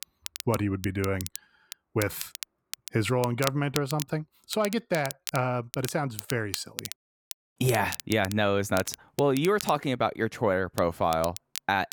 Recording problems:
crackle, like an old record; noticeable; 10 dB below the speech

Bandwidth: 18.5 kHz